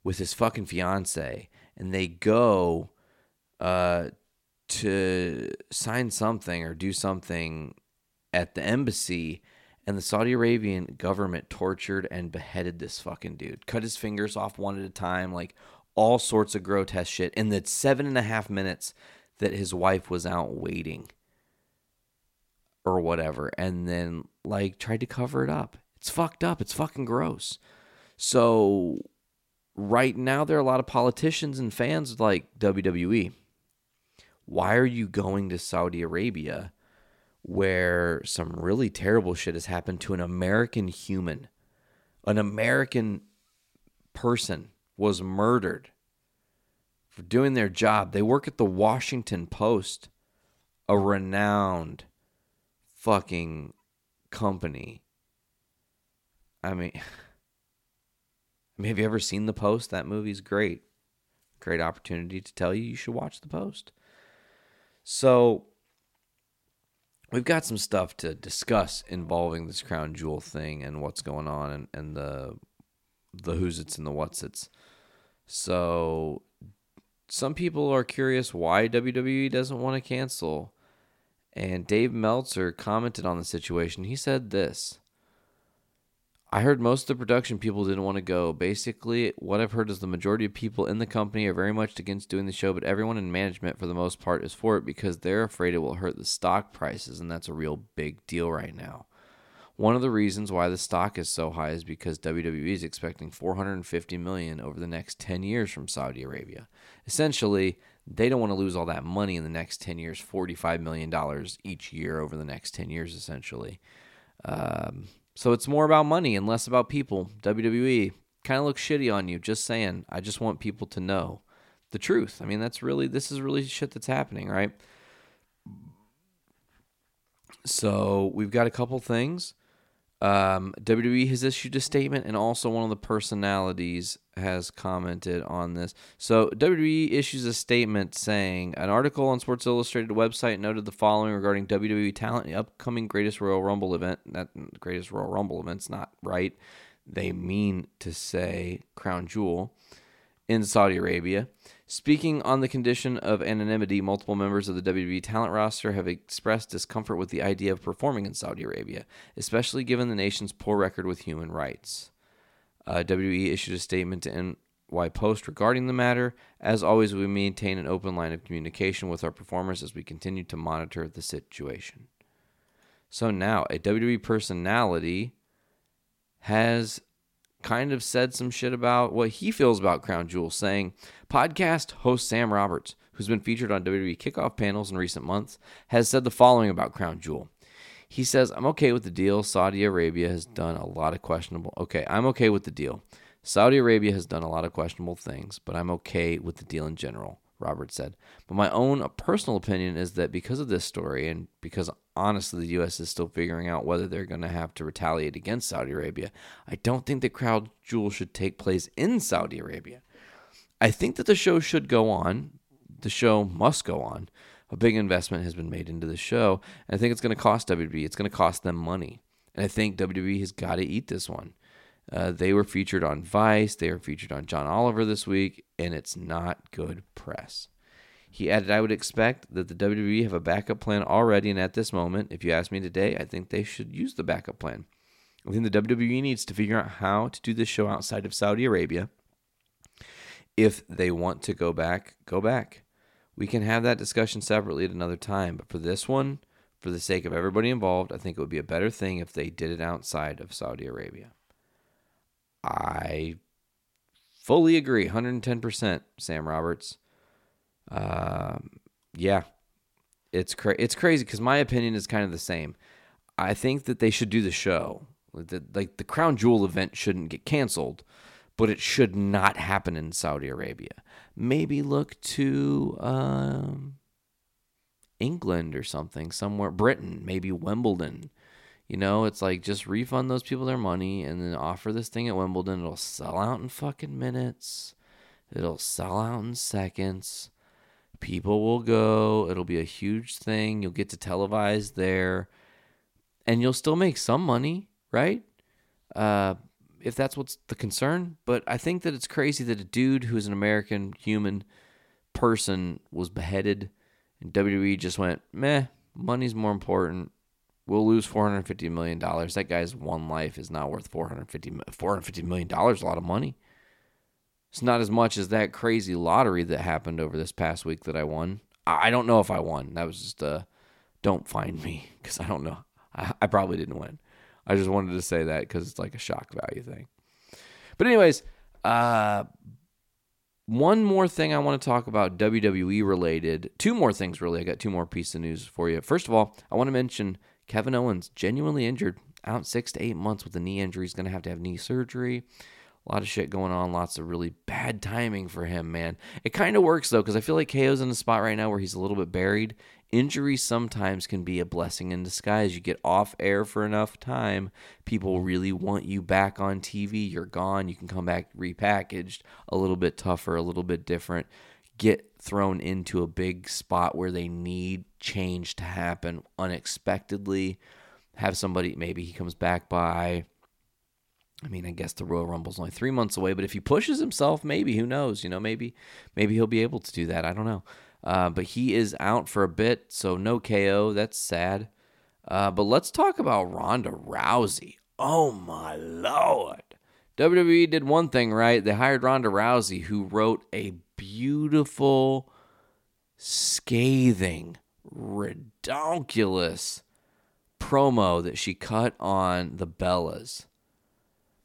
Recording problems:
none

